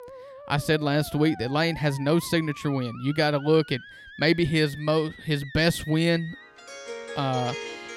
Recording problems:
background music; noticeable; throughout; 15 dB below the speech

